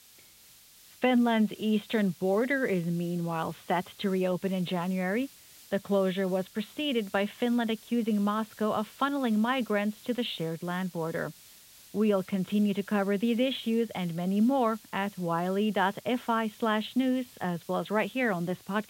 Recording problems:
high frequencies cut off; severe; nothing above 4 kHz
hiss; faint; throughout; 20 dB below the speech

